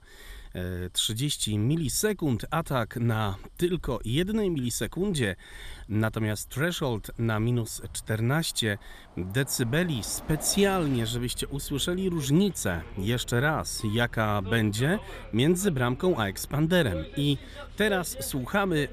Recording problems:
traffic noise; noticeable; throughout; 20 dB below the speech

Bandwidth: 14.5 kHz